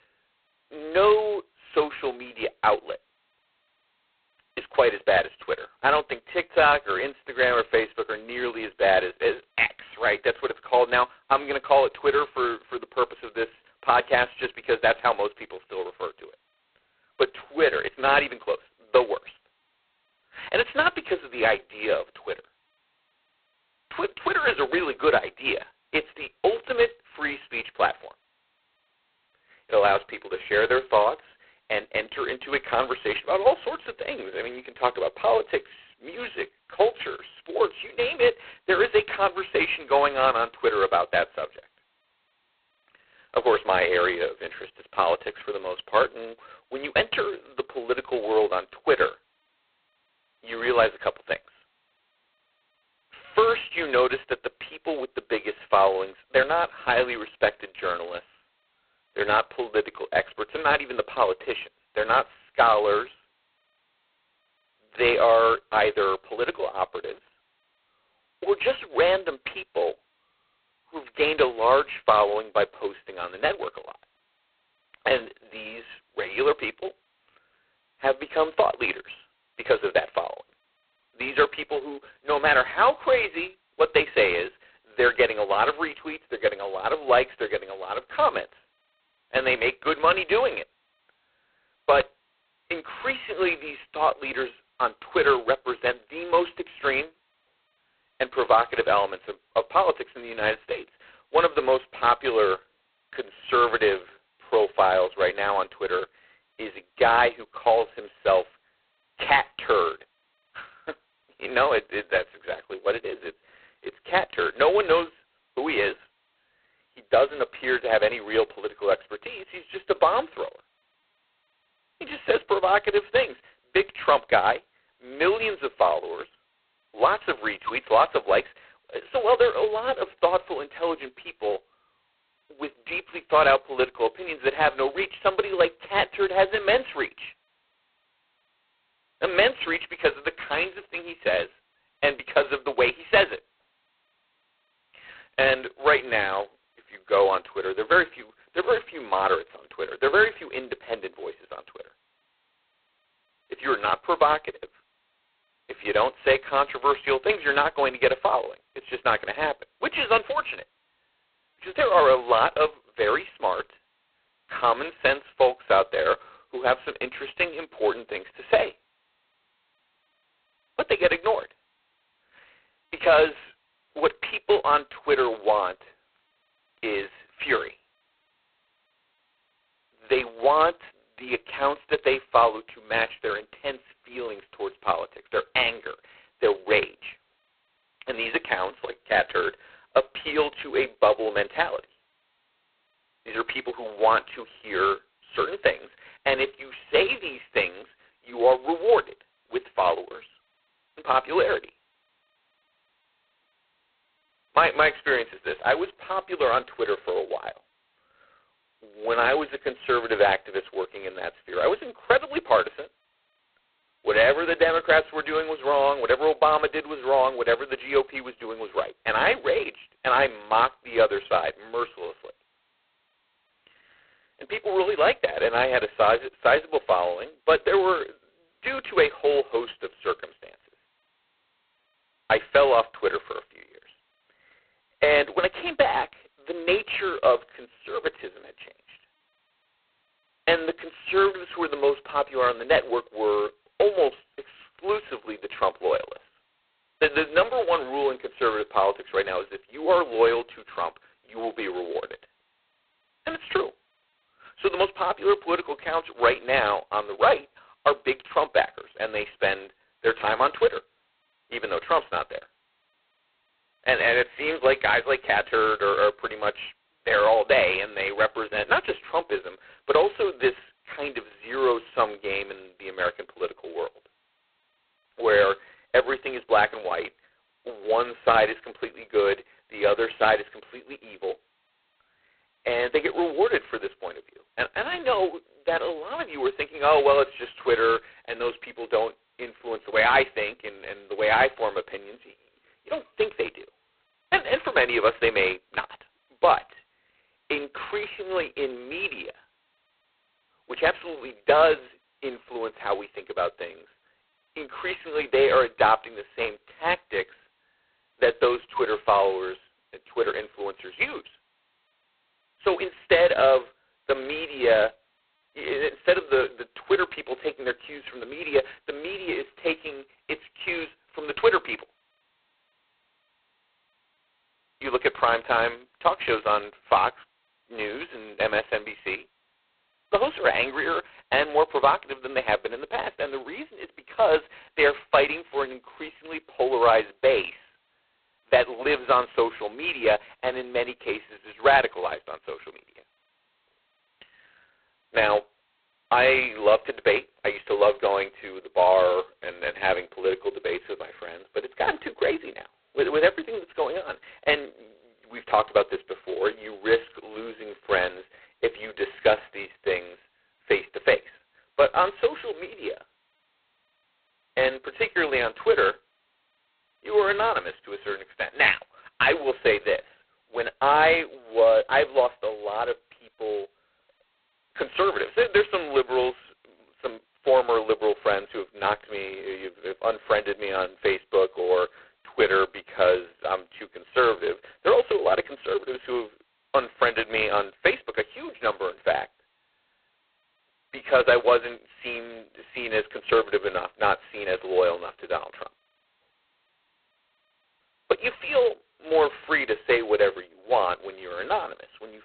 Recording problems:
phone-call audio; poor line; nothing above 4 kHz

